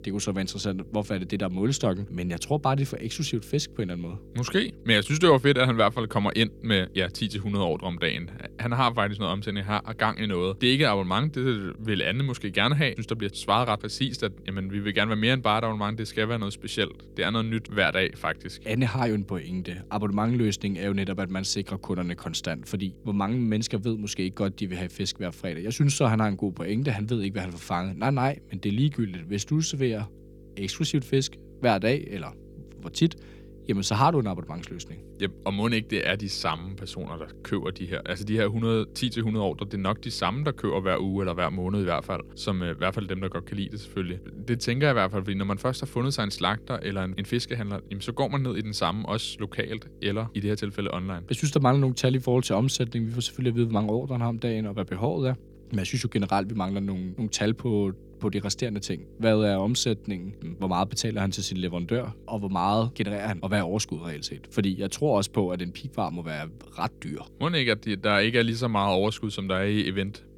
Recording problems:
electrical hum; faint; throughout; 50 Hz, 25 dB below the speech

